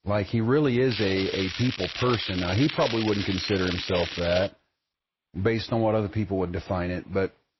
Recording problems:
garbled, watery; slightly; nothing above 5.5 kHz
crackling; loud; from 1 to 4.5 s; 6 dB below the speech

